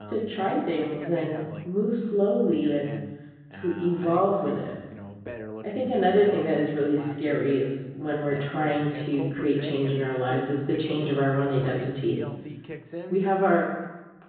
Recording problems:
off-mic speech; far
high frequencies cut off; severe; nothing above 4 kHz
room echo; noticeable; dies away in 1 s
muffled; very slightly; fading above 2 kHz
voice in the background; noticeable; throughout; 15 dB below the speech

